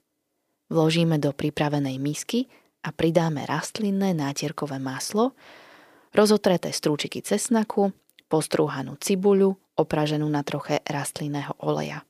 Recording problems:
none

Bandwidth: 15 kHz